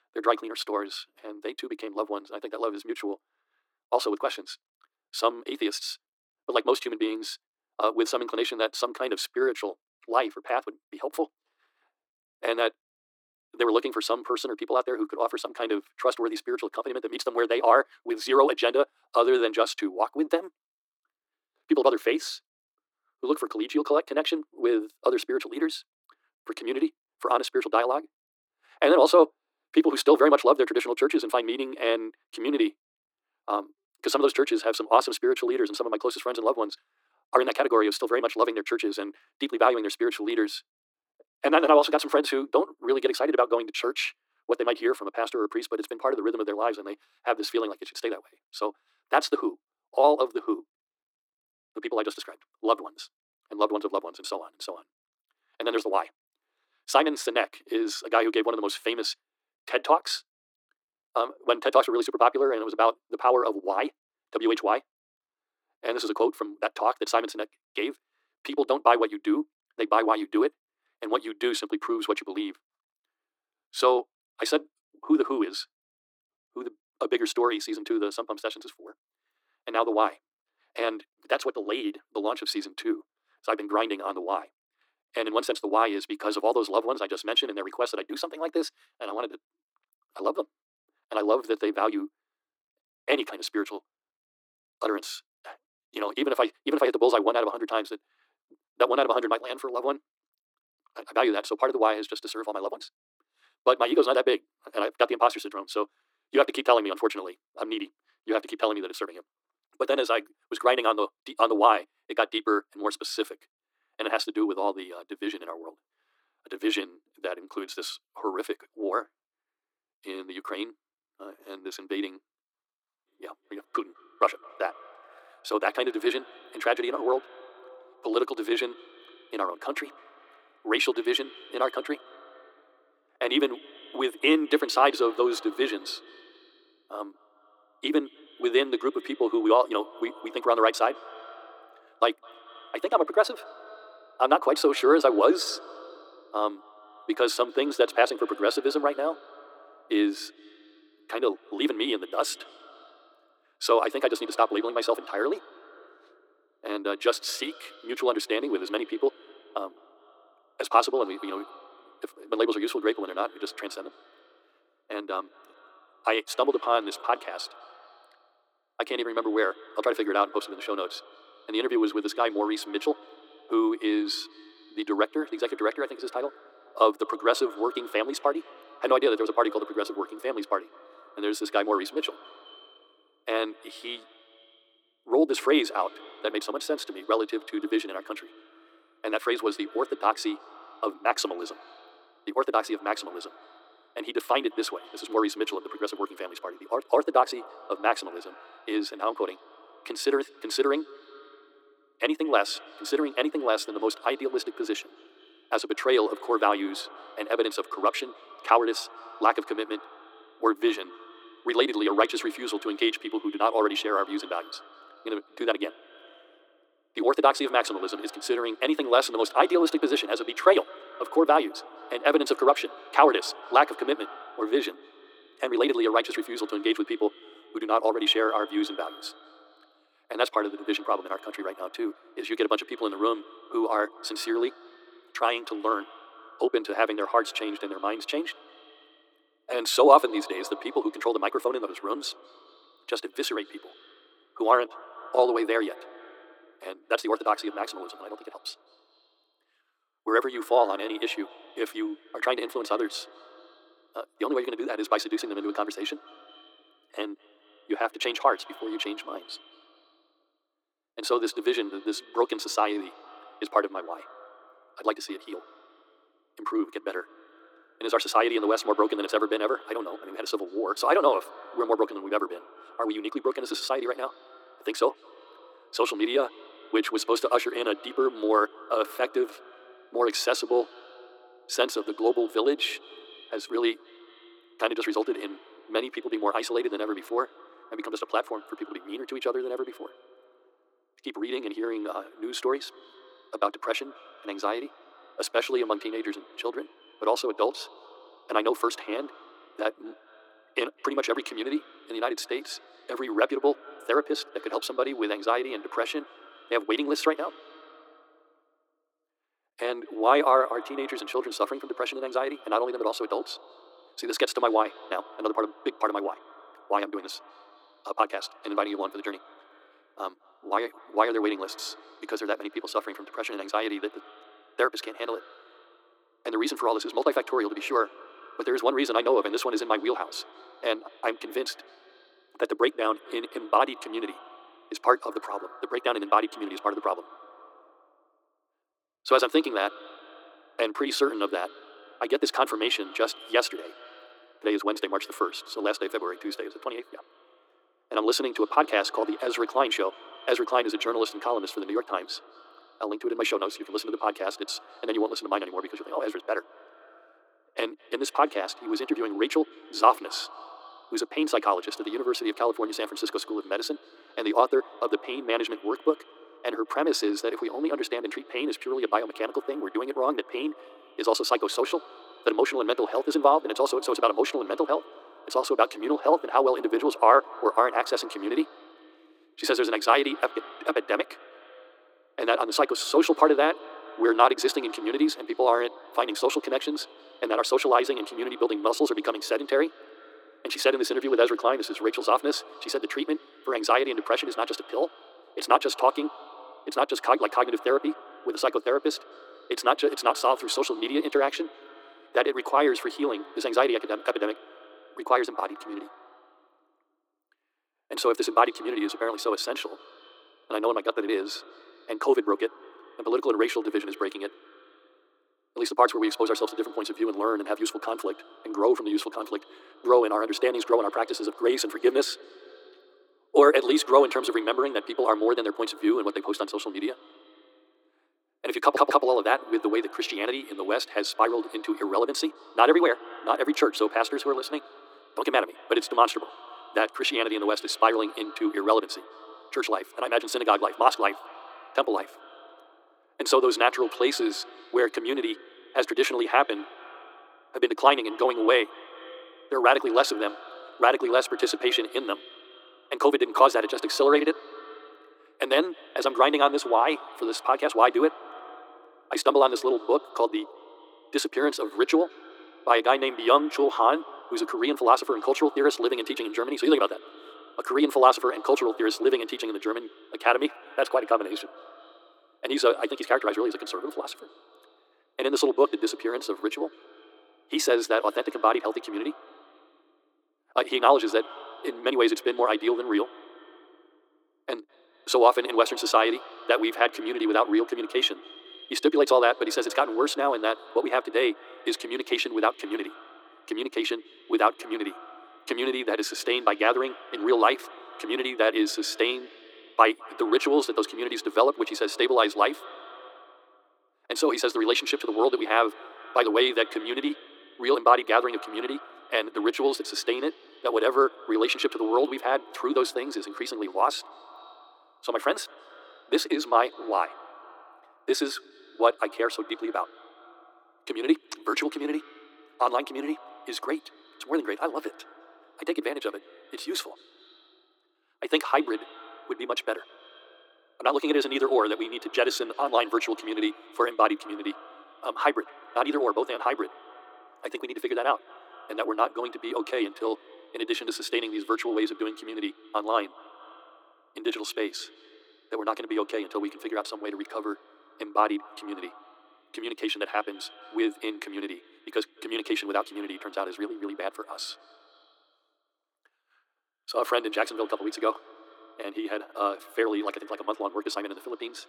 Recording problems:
thin; very; fading below 300 Hz
wrong speed, natural pitch; too fast; 1.8 times normal speed
muffled; slightly; fading above 2.5 kHz
echo of what is said; faint; from 2:03 on; 200 ms later, 20 dB below the speech
audio stuttering; at 7:09

